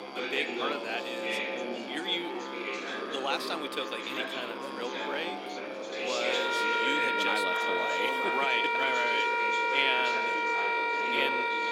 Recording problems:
thin; somewhat; fading below 300 Hz
background music; very loud; throughout; 3 dB above the speech
chatter from many people; loud; throughout; 3 dB below the speech
animal sounds; noticeable; throughout; 15 dB below the speech

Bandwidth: 16 kHz